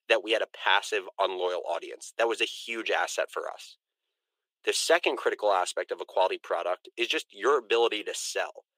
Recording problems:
thin; very; fading below 350 Hz

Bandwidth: 15.5 kHz